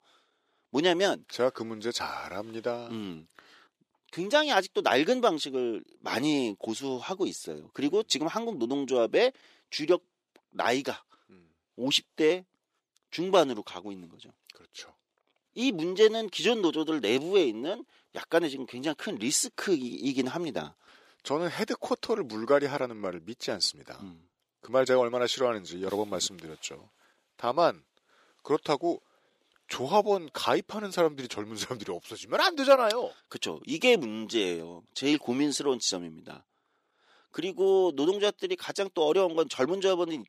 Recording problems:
thin; somewhat; fading below 400 Hz

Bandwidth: 15 kHz